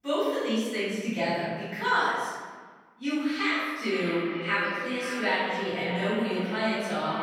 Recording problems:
echo of what is said; strong; from 4 s on; 520 ms later, 8 dB below the speech
room echo; strong; dies away in 1.4 s
off-mic speech; far

